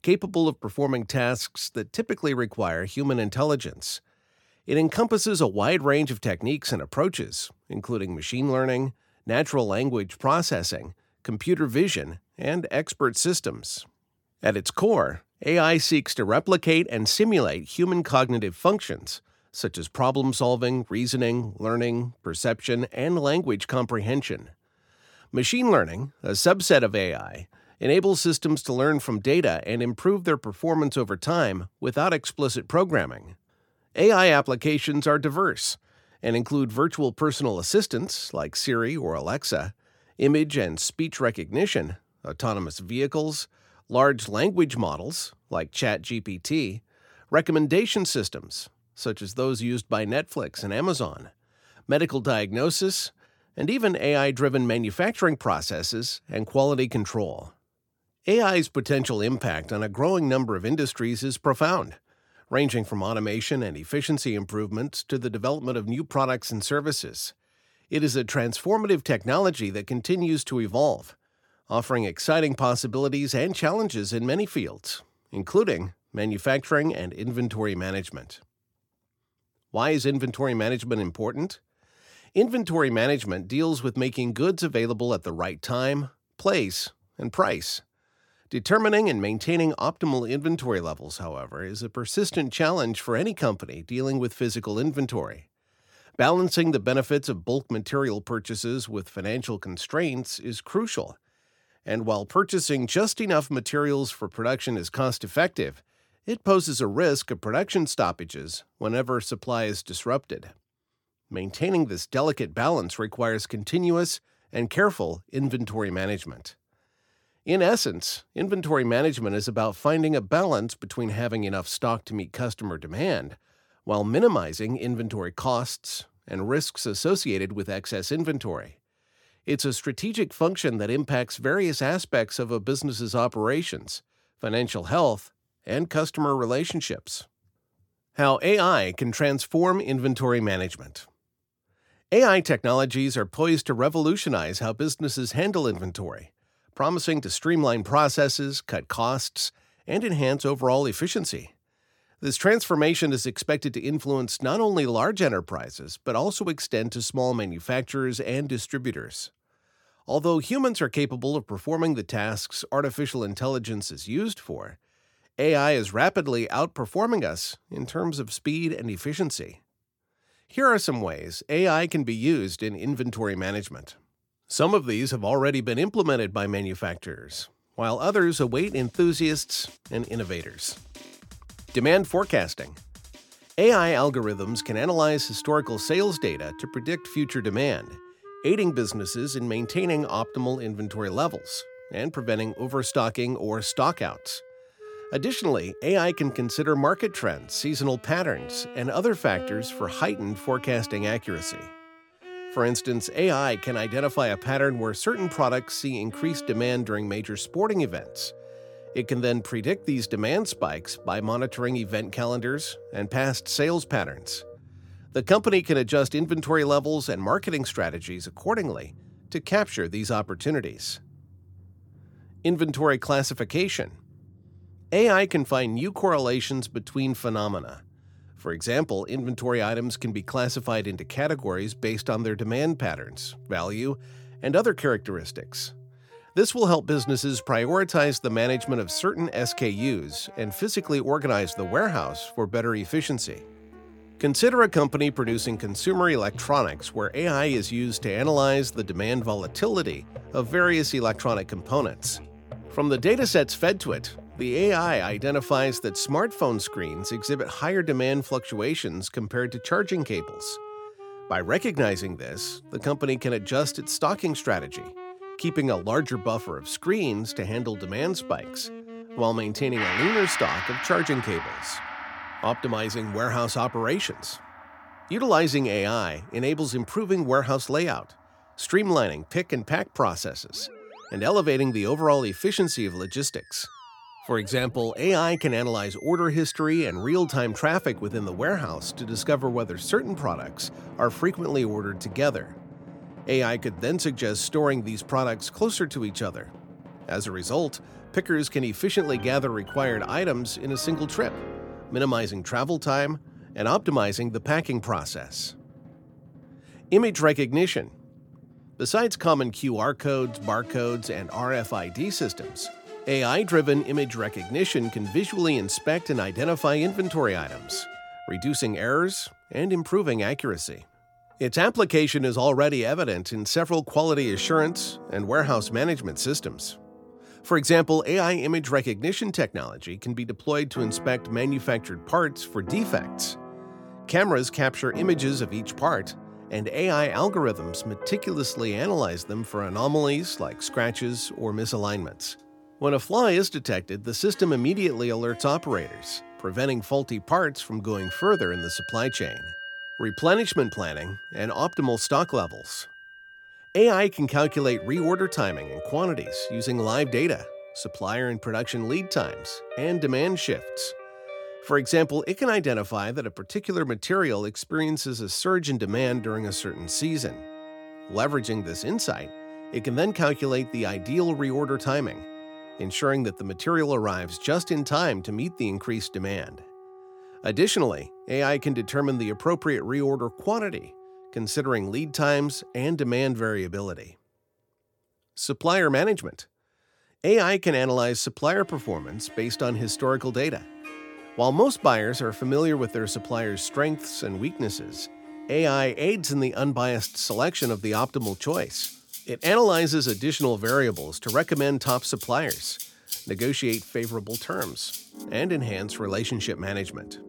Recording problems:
background music; noticeable; from 2:58 on; 15 dB below the speech

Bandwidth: 18 kHz